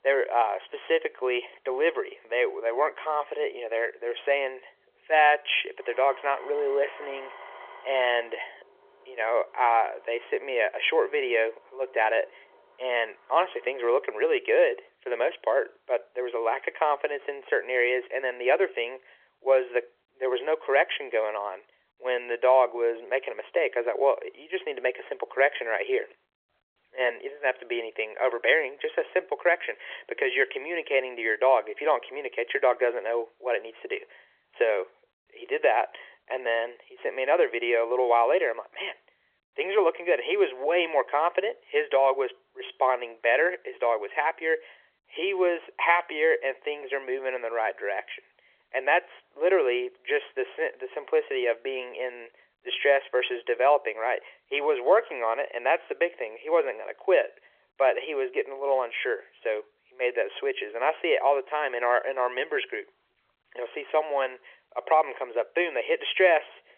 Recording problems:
phone-call audio; nothing above 3.5 kHz
traffic noise; faint; until 14 s; 25 dB below the speech

